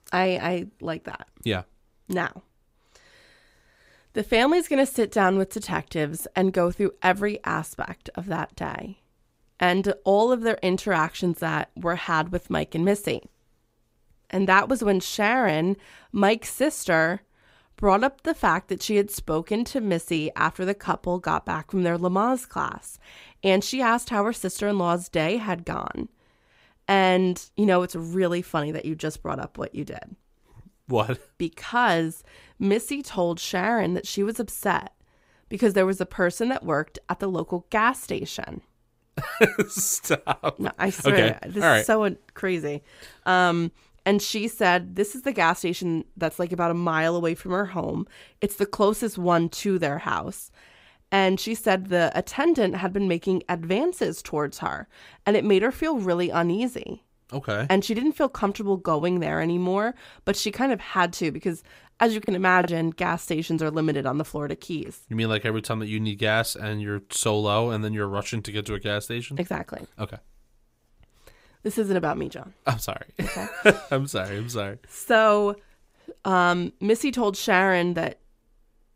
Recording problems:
choppy; very; at 1:02; 8% of the speech affected

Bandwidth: 15.5 kHz